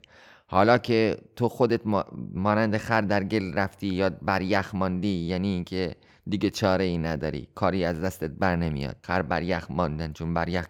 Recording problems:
none

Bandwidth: 17 kHz